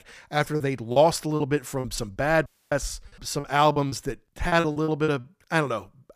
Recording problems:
choppy; very; from 0.5 to 2 s, at 3 s and at 4.5 s; 15% of the speech affected
audio cutting out; at 2.5 s

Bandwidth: 15 kHz